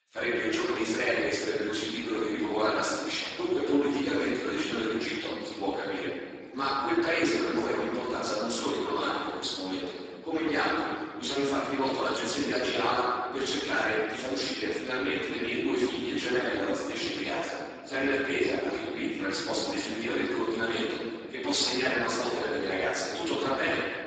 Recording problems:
room echo; strong; dies away in 1.7 s
off-mic speech; far
garbled, watery; badly; nothing above 7.5 kHz
thin; somewhat; fading below 300 Hz

